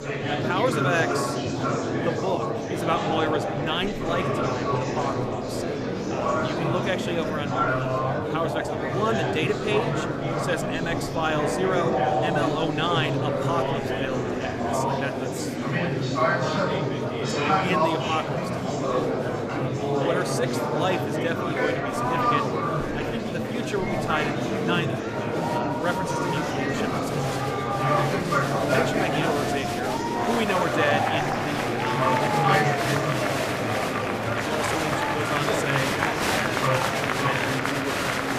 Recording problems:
murmuring crowd; very loud; throughout; 5 dB above the speech

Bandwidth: 14.5 kHz